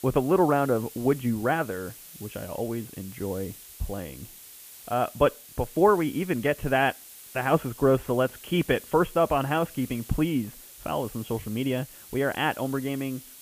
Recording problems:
high frequencies cut off; severe; nothing above 3.5 kHz
hiss; noticeable; throughout; 15 dB below the speech

